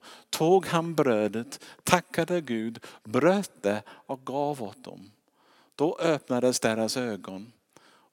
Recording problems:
none

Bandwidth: 17 kHz